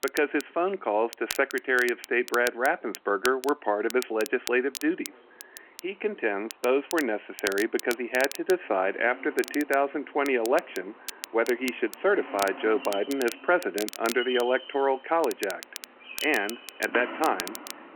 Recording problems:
phone-call audio
animal sounds; noticeable; throughout; 15 dB below the speech
crackle, like an old record; noticeable; 15 dB below the speech

